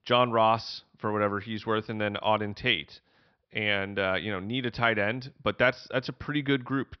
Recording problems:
high frequencies cut off; noticeable; nothing above 5.5 kHz

